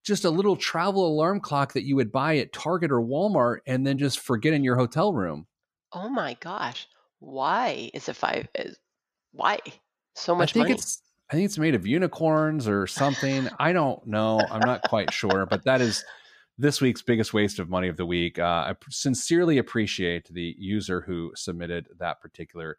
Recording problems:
none

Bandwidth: 14.5 kHz